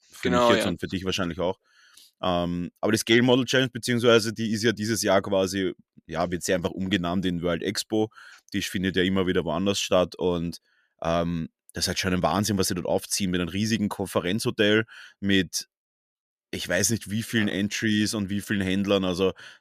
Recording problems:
none

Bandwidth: 14.5 kHz